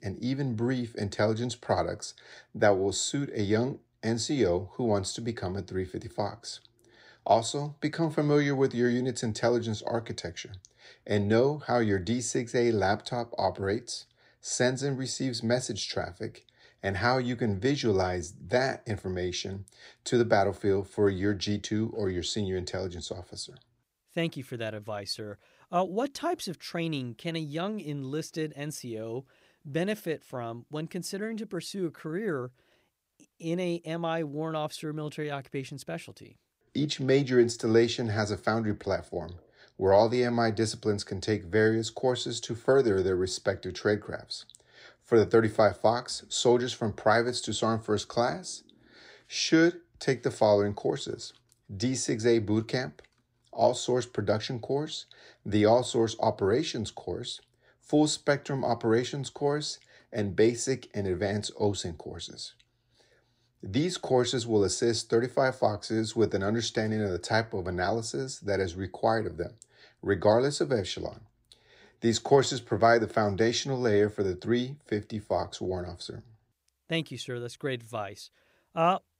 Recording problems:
none

